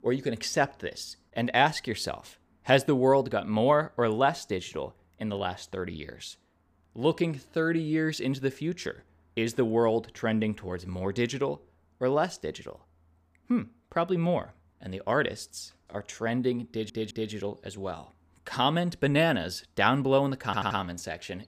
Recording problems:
audio stuttering; at 17 s and at 20 s

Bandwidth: 15 kHz